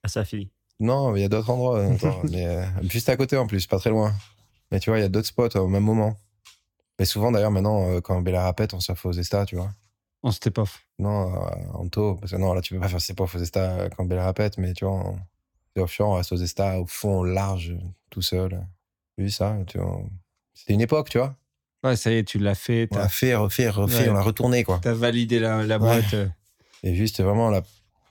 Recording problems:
none

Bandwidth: 17.5 kHz